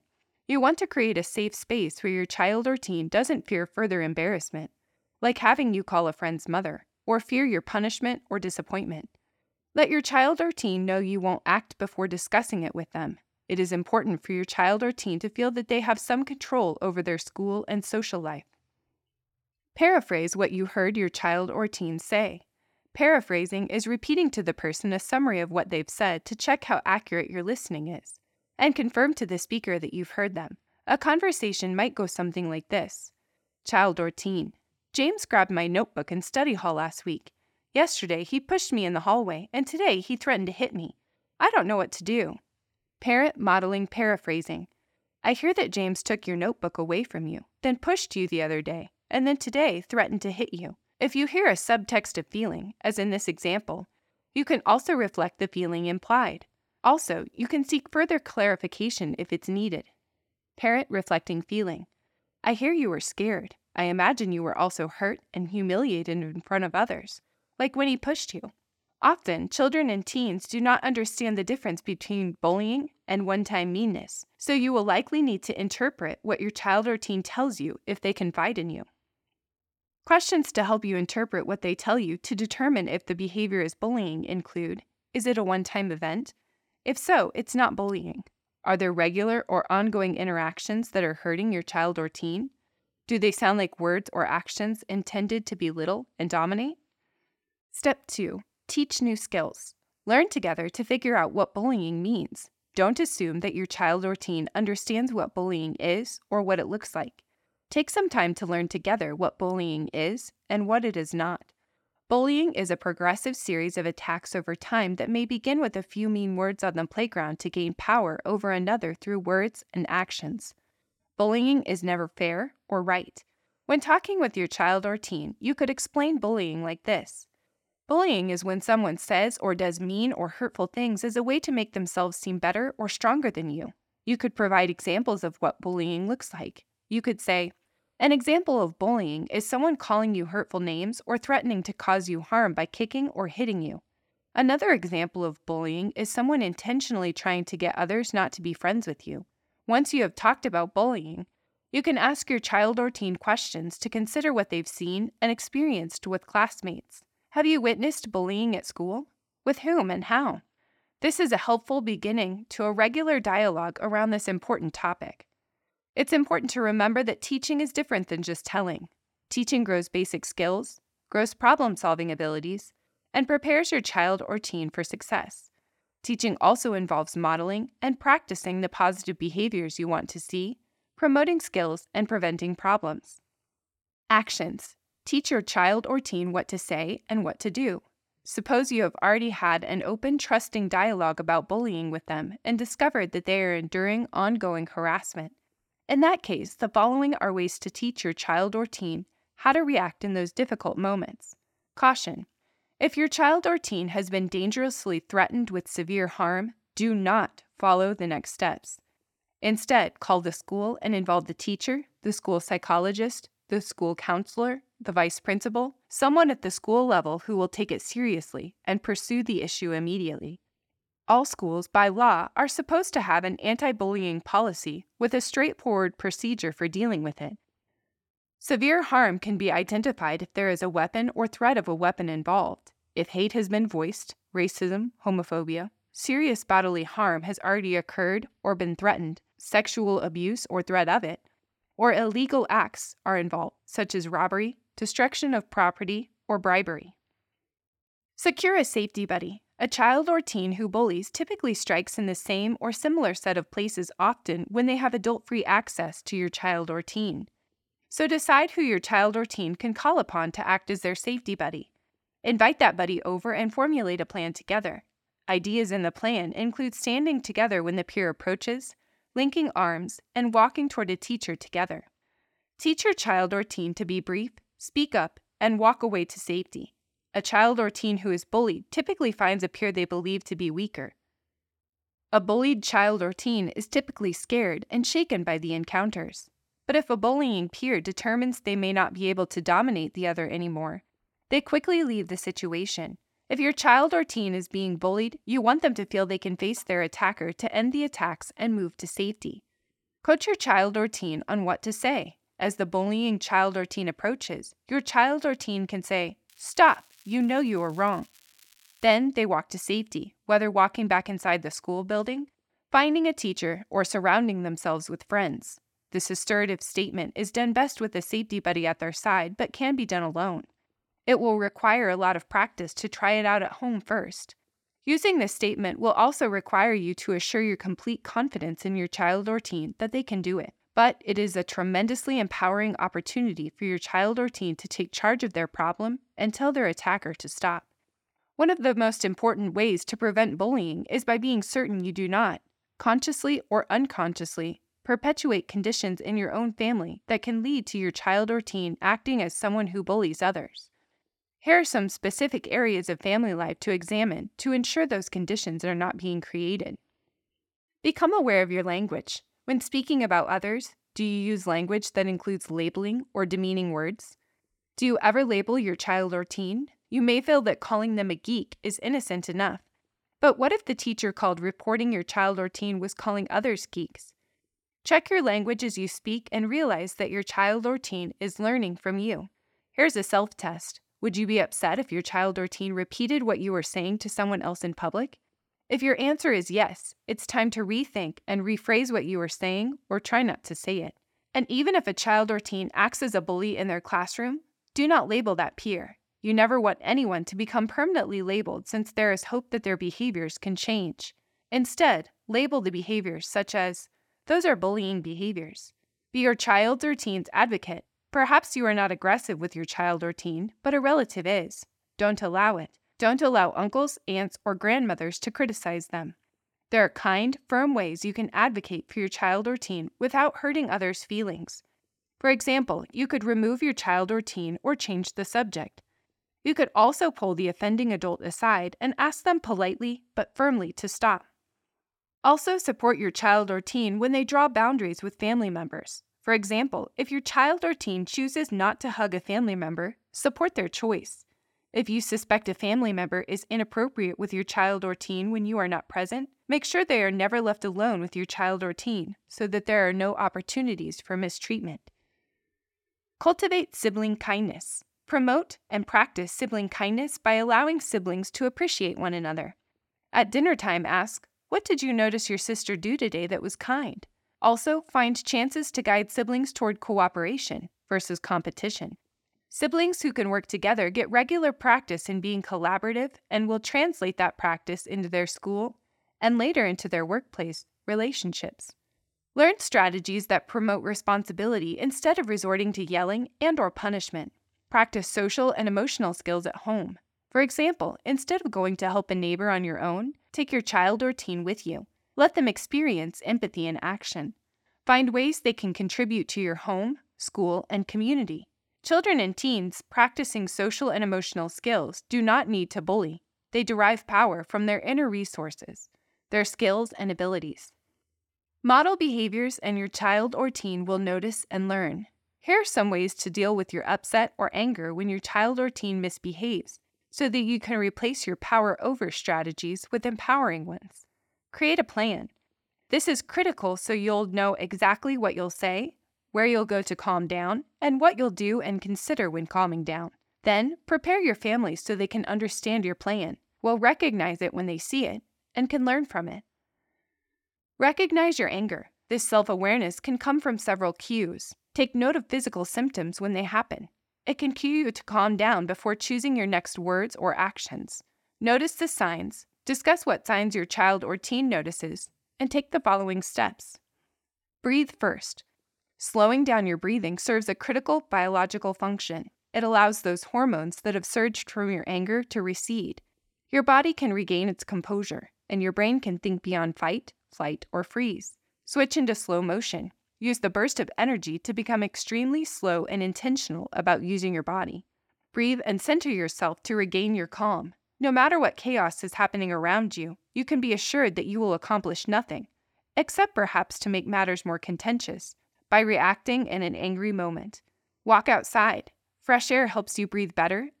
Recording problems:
crackling; faint; from 5:06 to 5:09; 30 dB below the speech

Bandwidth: 17 kHz